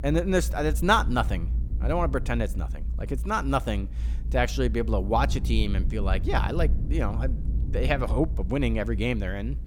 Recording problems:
low rumble; noticeable; throughout; 20 dB below the speech

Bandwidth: 17.5 kHz